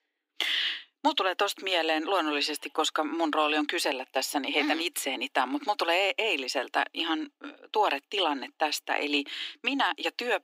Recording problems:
thin; somewhat; fading below 300 Hz

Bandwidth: 15.5 kHz